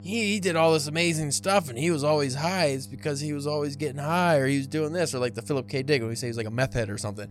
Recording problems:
electrical hum; faint; throughout; 50 Hz, 25 dB below the speech

